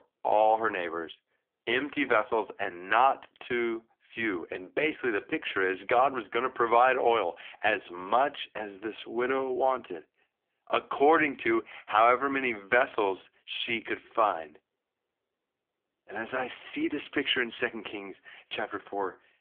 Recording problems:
phone-call audio; poor line; nothing above 3.5 kHz

